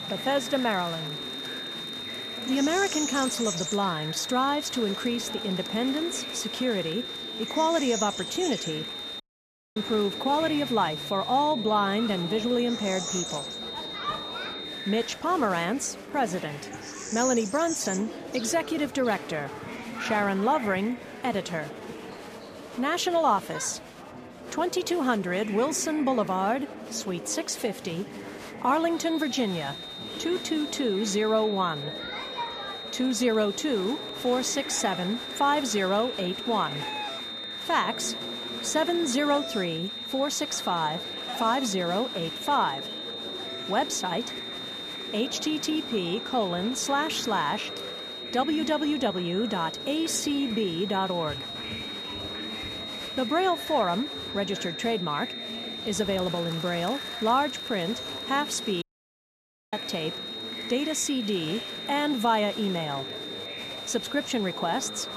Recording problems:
high-pitched whine; loud; until 15 s and from 29 s on; 3.5 kHz, 7 dB below the speech
animal sounds; noticeable; throughout; 10 dB below the speech
murmuring crowd; noticeable; throughout; 10 dB below the speech
background music; faint; throughout; 30 dB below the speech
audio cutting out; at 9 s for 0.5 s and at 59 s for 1 s

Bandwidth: 14.5 kHz